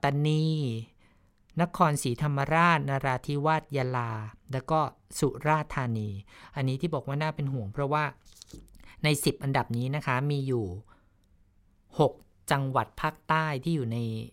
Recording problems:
none

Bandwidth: 16 kHz